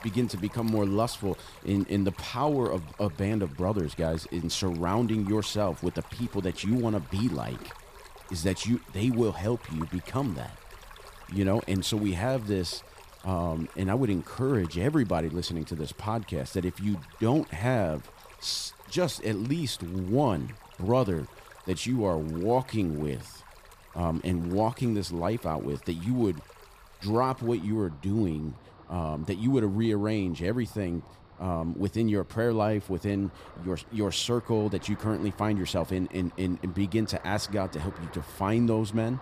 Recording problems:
rain or running water; faint; throughout; 20 dB below the speech

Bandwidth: 14.5 kHz